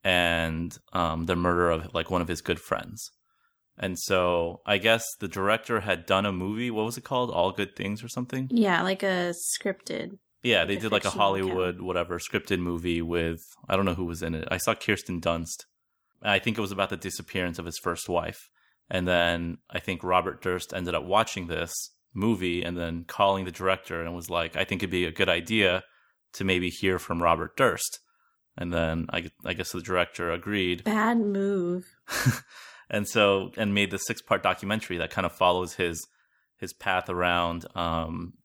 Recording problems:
none

